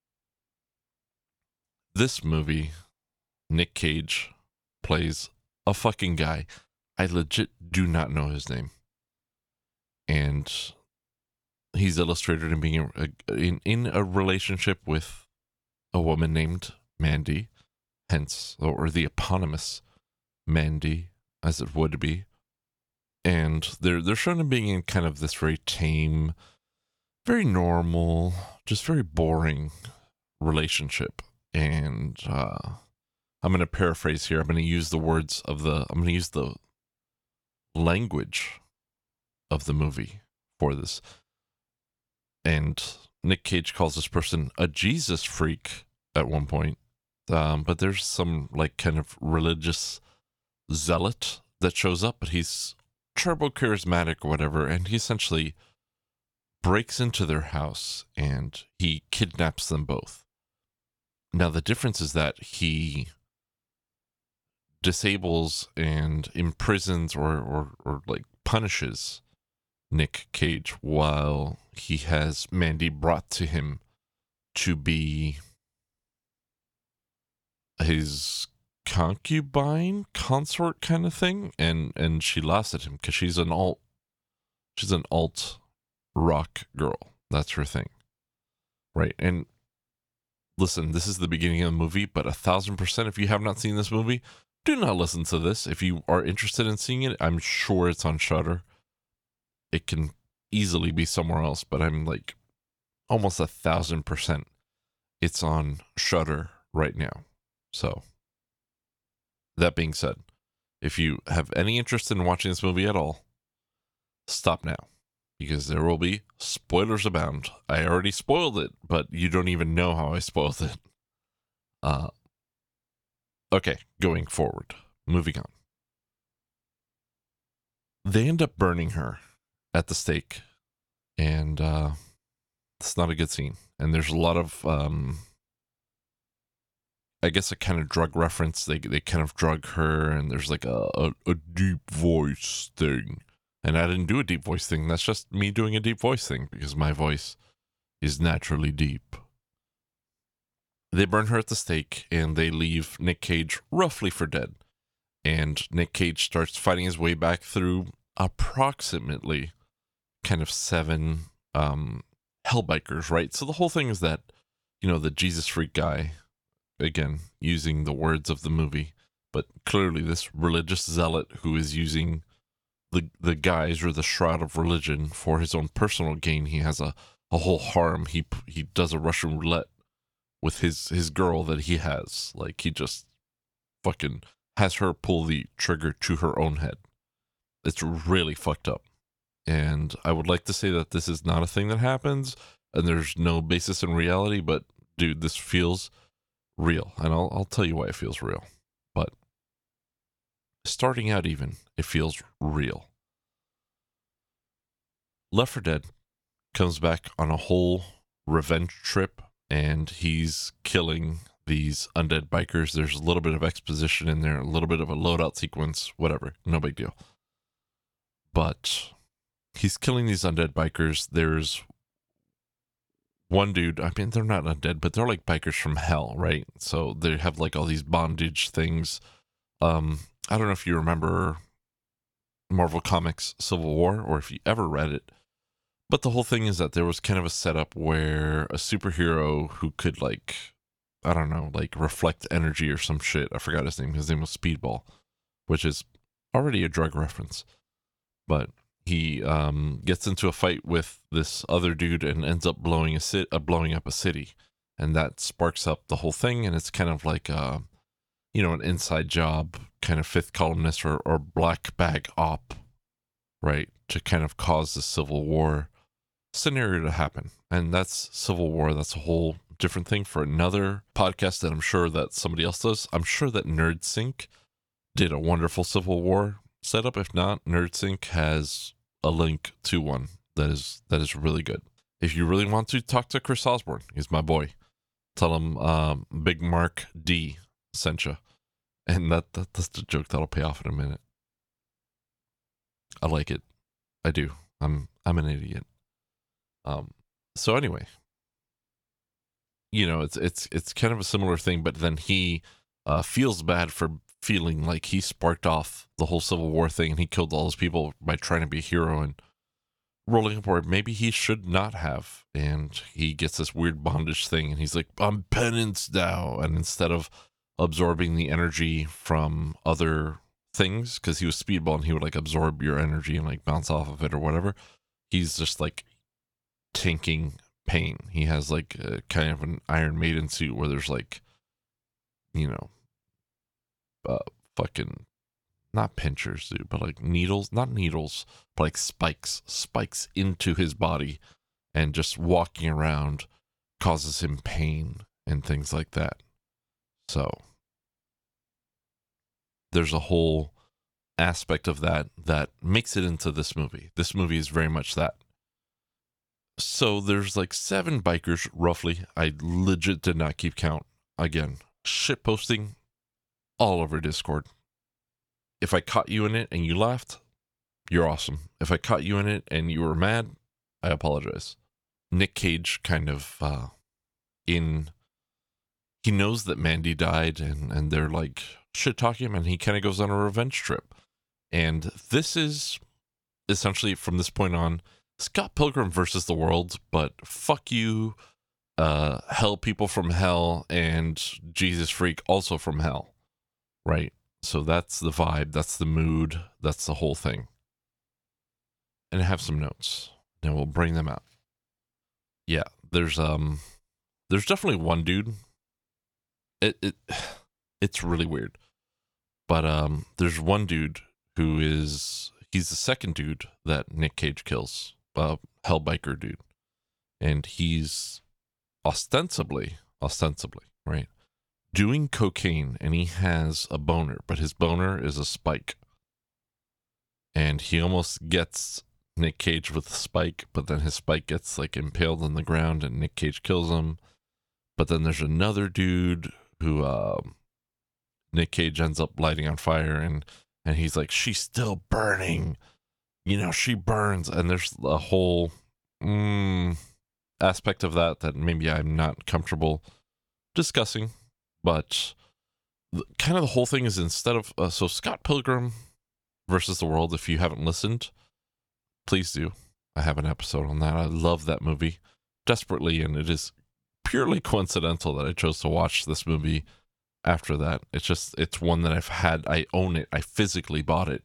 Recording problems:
none

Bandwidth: 18.5 kHz